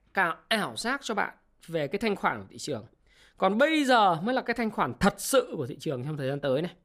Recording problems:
none

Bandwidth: 15 kHz